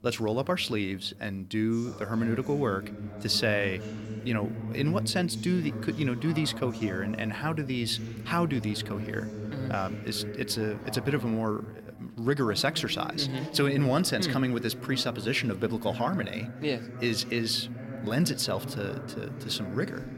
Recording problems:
voice in the background; loud; throughout; 9 dB below the speech

